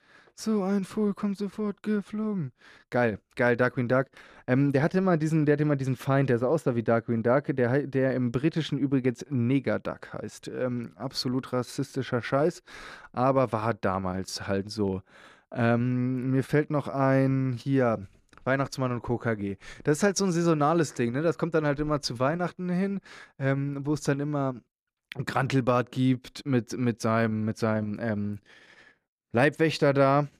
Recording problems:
none

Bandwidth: 14 kHz